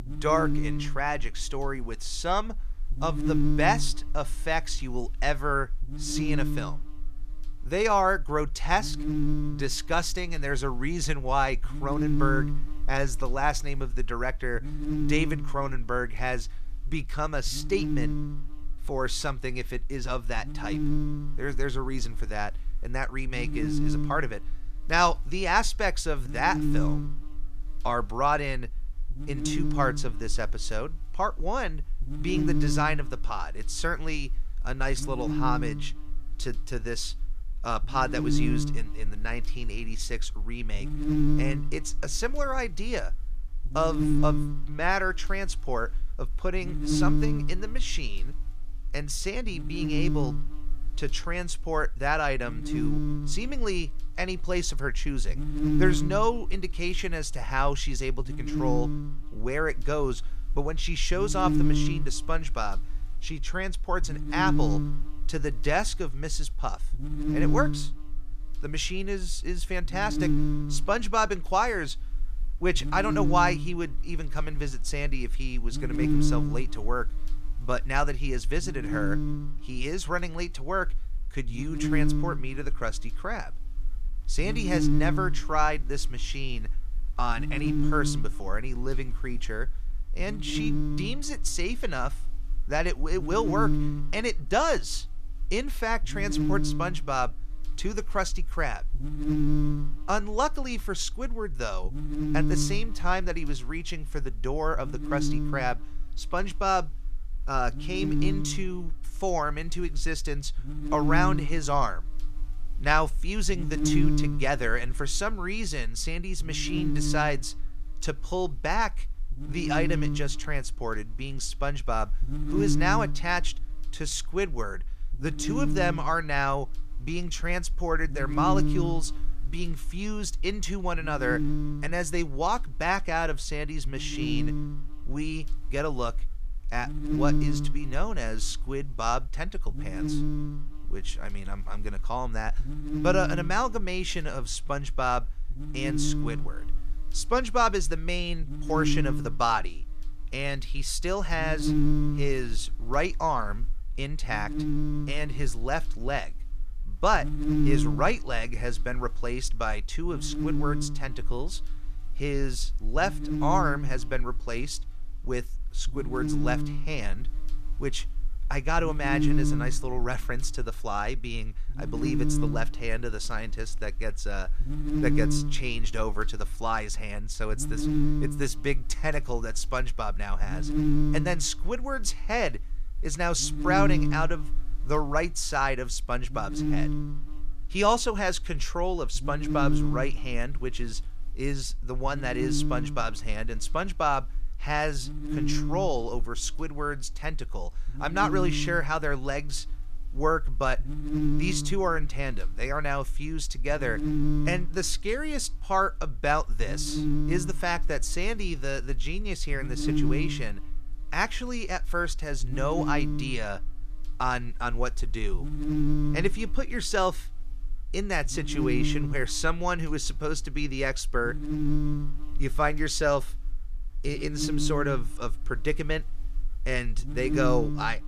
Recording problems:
electrical hum; very faint; throughout; 60 Hz, 6 dB below the speech

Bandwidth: 15 kHz